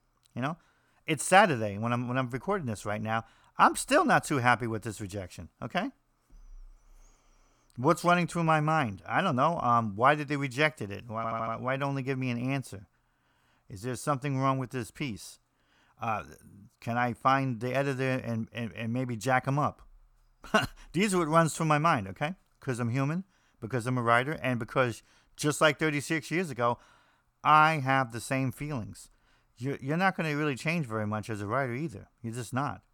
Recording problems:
audio stuttering; at 11 s

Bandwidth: 18.5 kHz